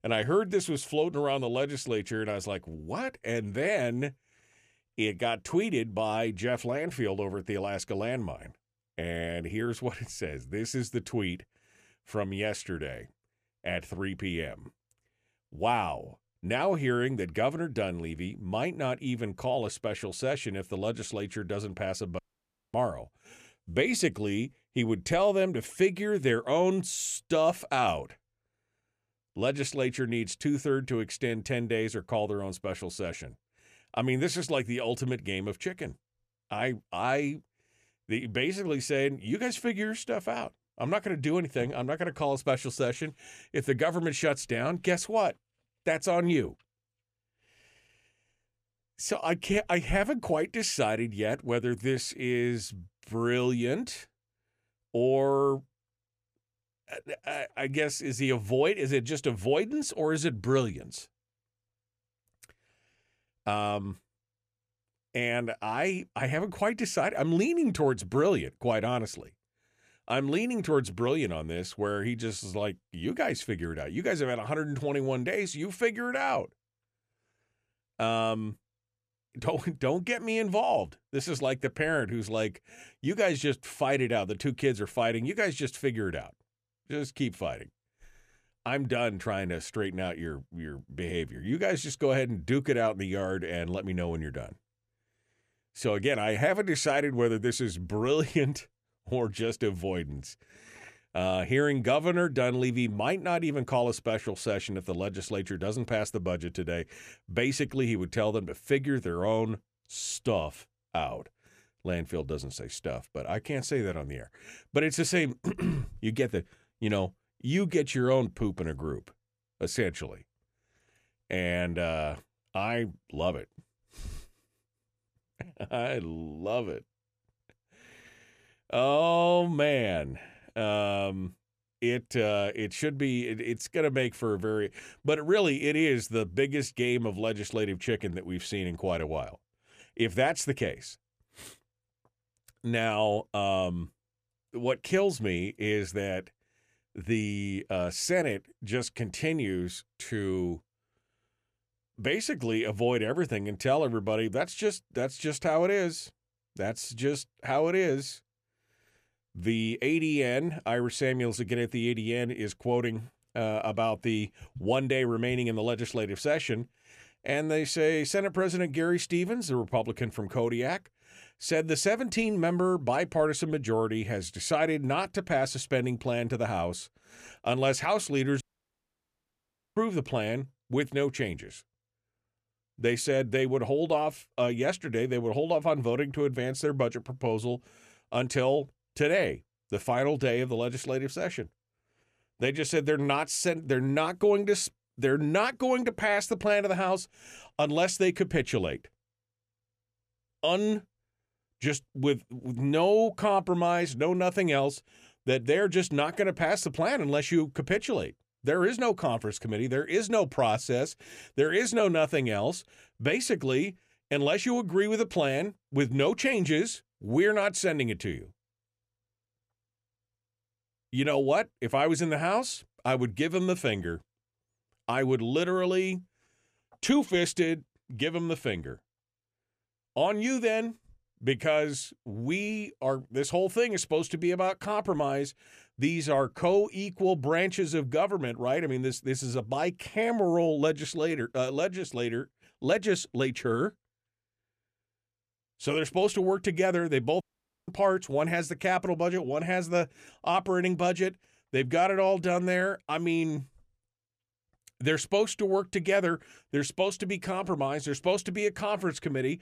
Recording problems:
audio cutting out; at 22 s for 0.5 s, at 2:58 for 1.5 s and at 4:07

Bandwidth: 14.5 kHz